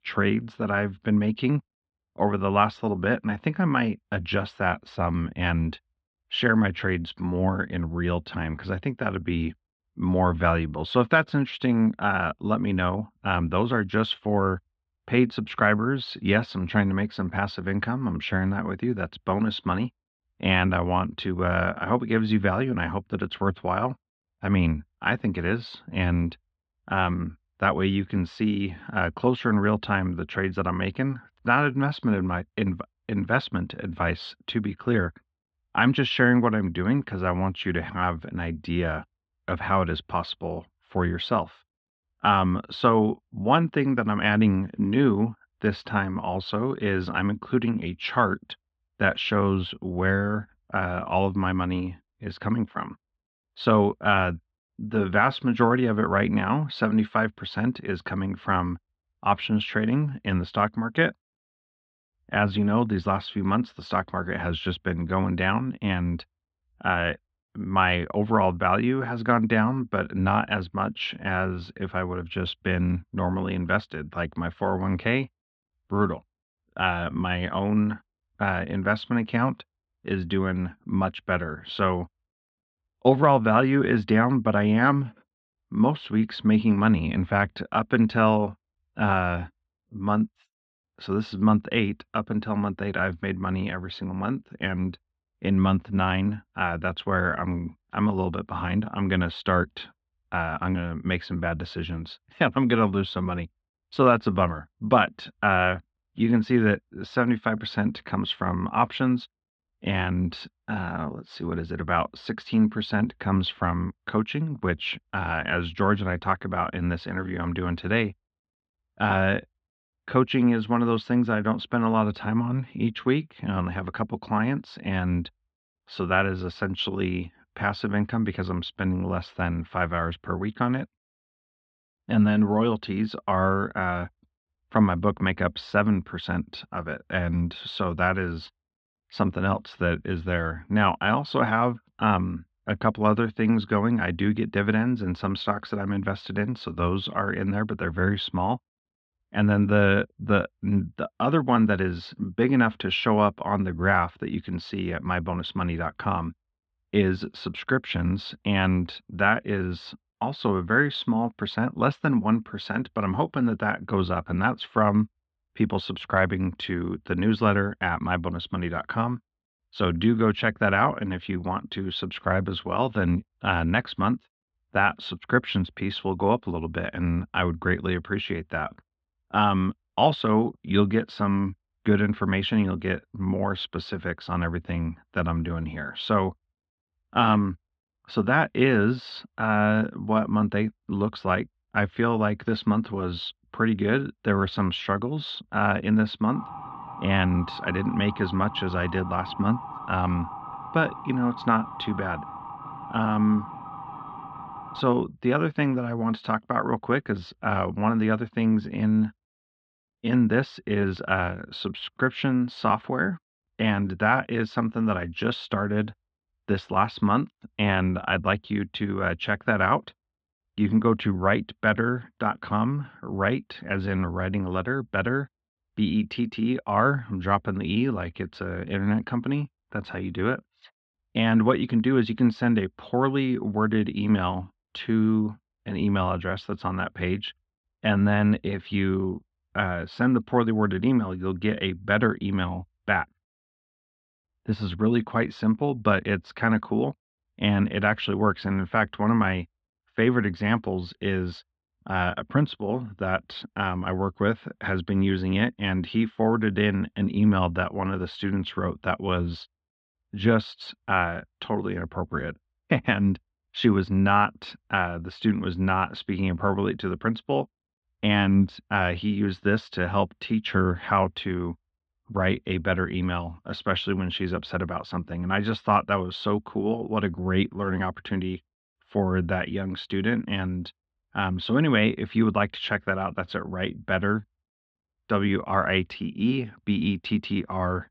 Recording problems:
muffled; very; fading above 3.5 kHz
siren; faint; from 3:16 to 3:25; peak 10 dB below the speech

